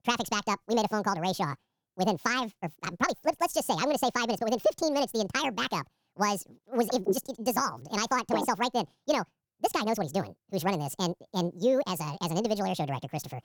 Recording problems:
wrong speed and pitch; too fast and too high; 1.7 times normal speed

